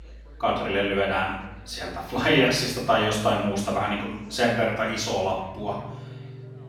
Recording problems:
off-mic speech; far
room echo; noticeable; dies away in 0.8 s
background music; faint; throughout; 20 dB below the speech
chatter from many people; faint; throughout; 25 dB below the speech

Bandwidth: 17 kHz